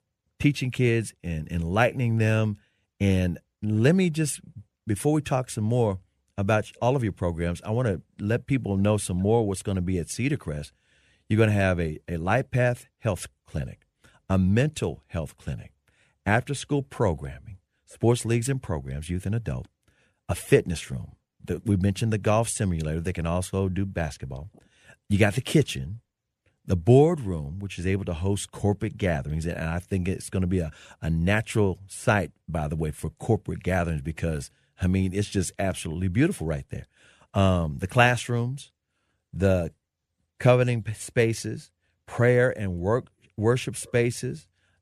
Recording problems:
none

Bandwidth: 14.5 kHz